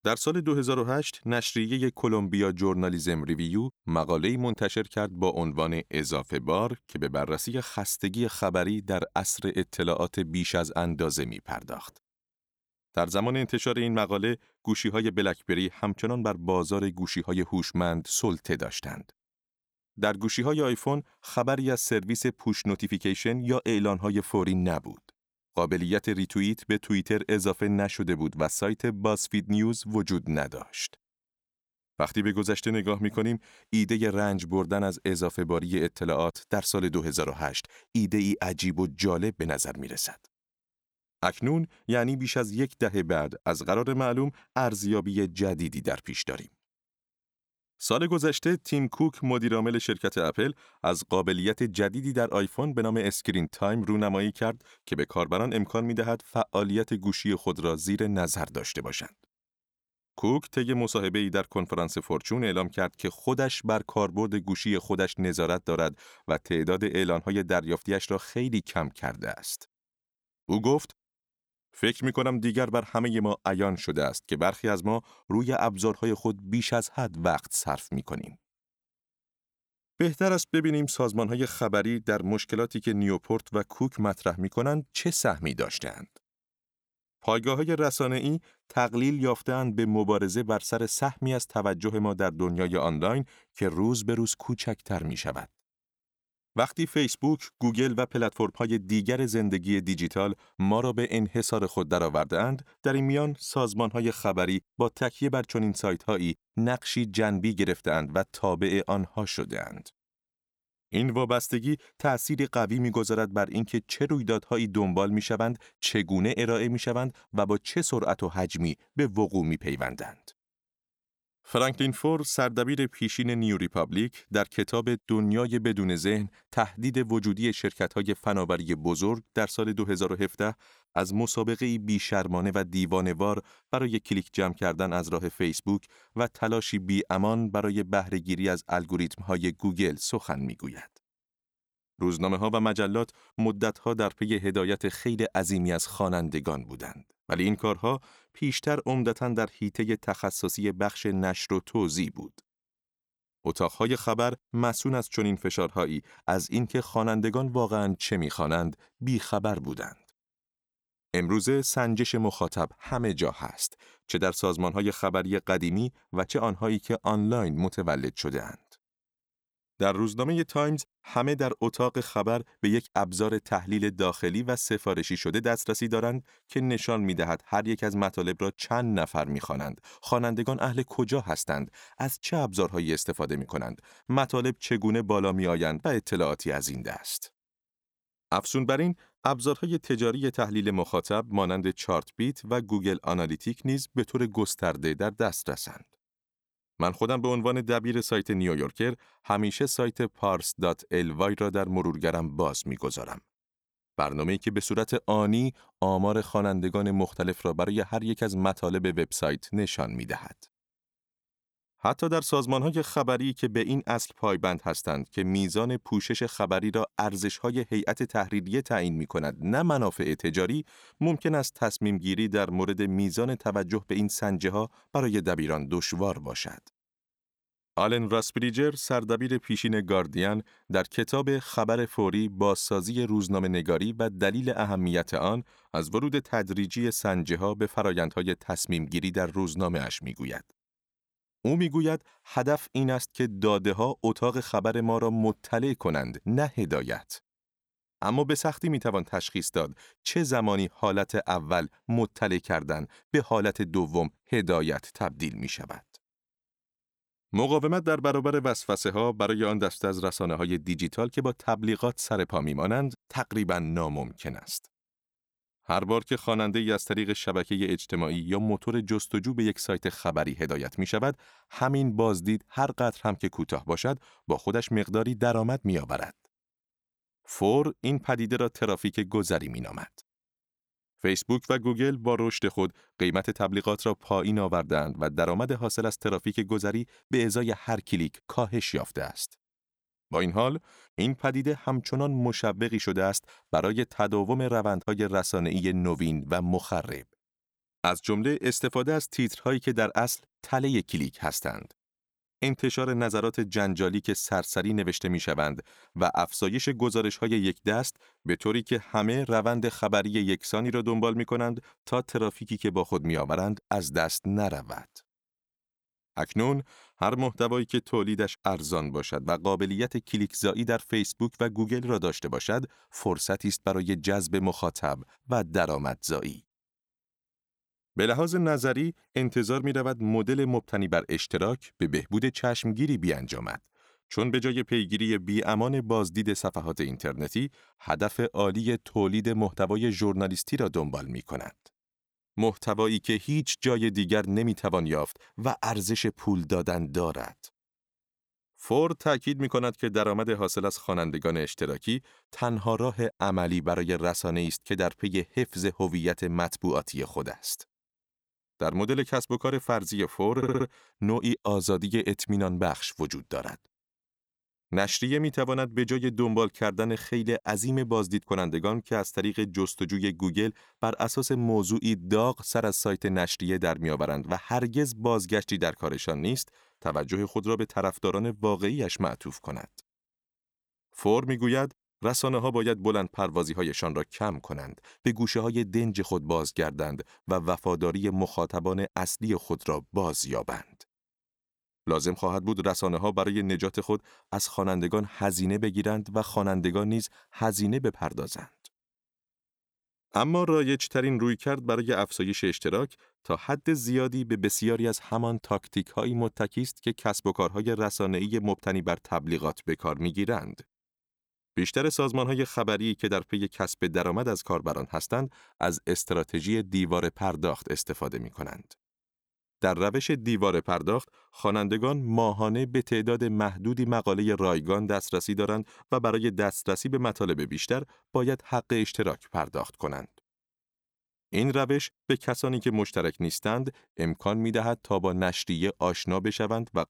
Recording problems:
audio stuttering; at 6:00

